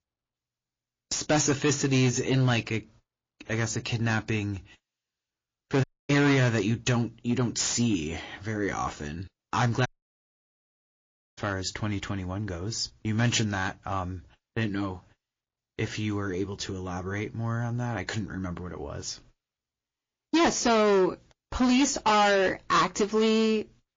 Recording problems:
distortion; heavy; 7% of the sound clipped
garbled, watery; slightly
audio cutting out; at 6 s and at 10 s for 1.5 s

